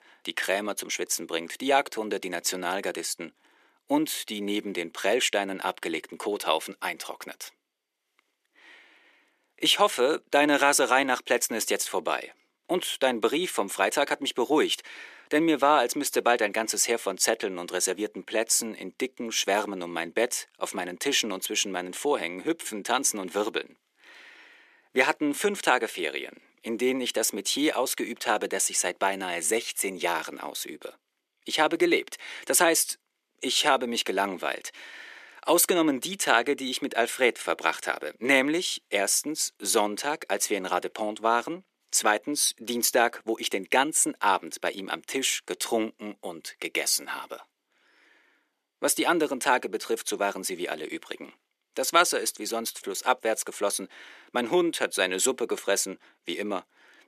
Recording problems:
thin; somewhat; fading below 350 Hz

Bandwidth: 14.5 kHz